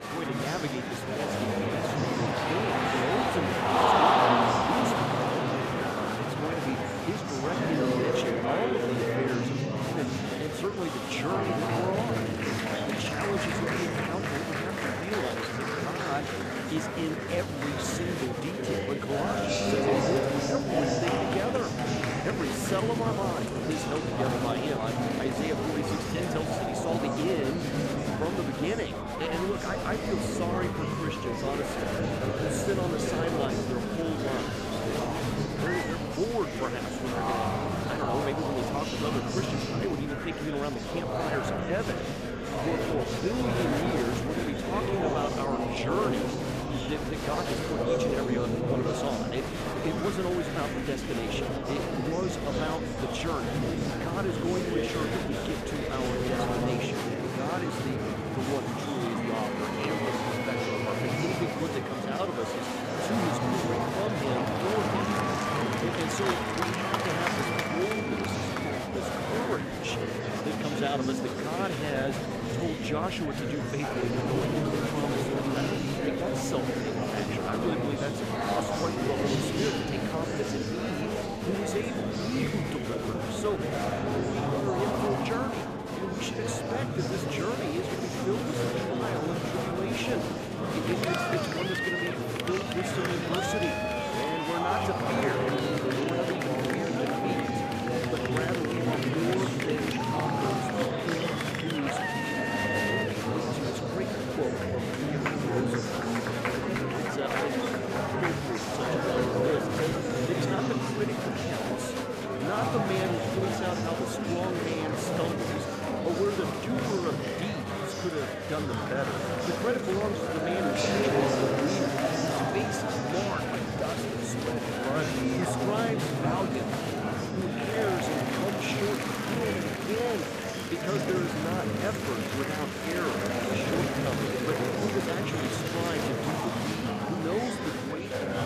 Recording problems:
murmuring crowd; very loud; throughout; 5 dB above the speech

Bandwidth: 14.5 kHz